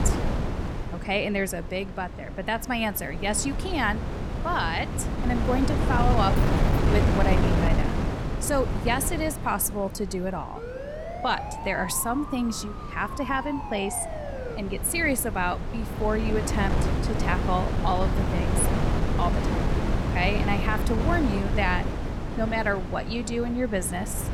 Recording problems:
wind noise on the microphone; heavy; 5 dB below the speech
jangling keys; faint; at 6.5 s; peak 20 dB below the speech
siren; noticeable; from 11 to 15 s; peak 7 dB below the speech

